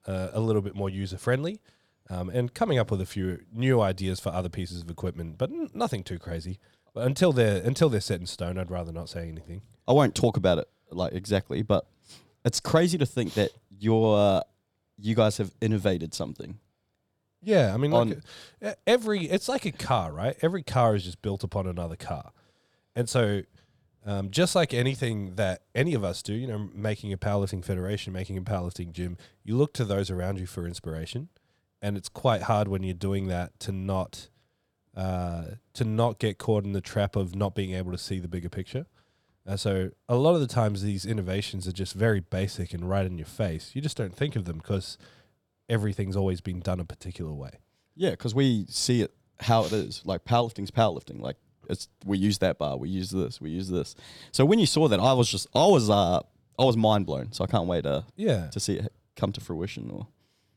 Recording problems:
none

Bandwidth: 19 kHz